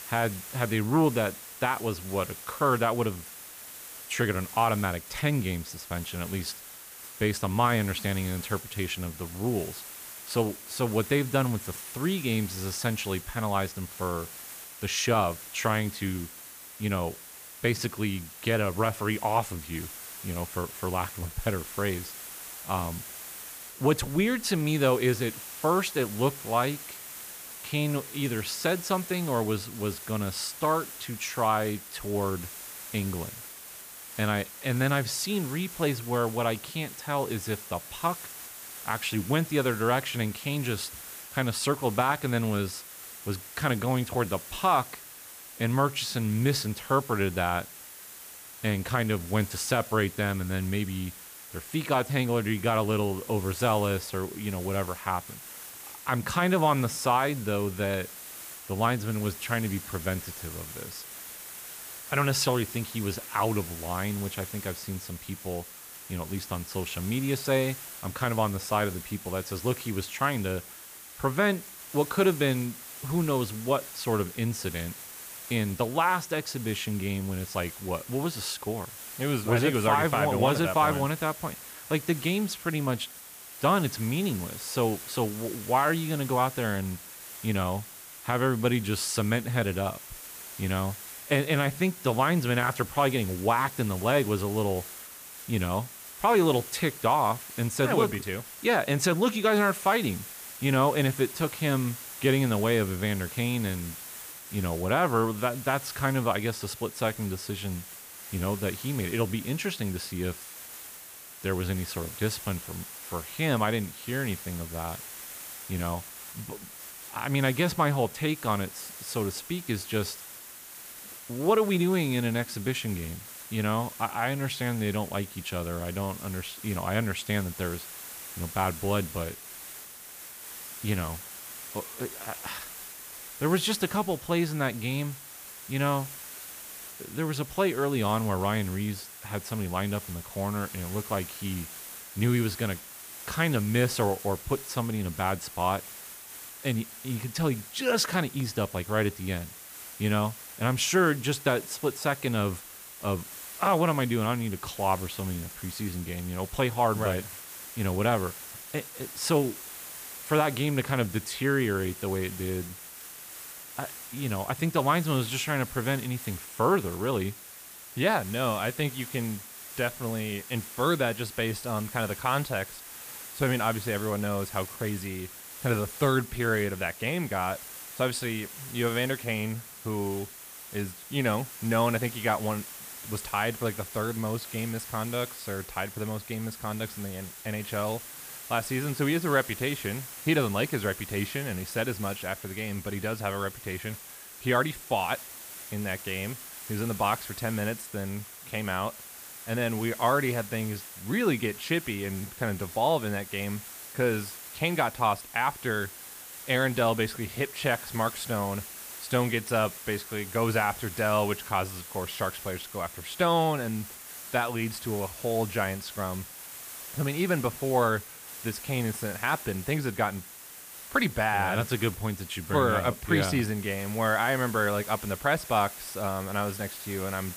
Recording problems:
hiss; noticeable; throughout; 10 dB below the speech

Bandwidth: 15 kHz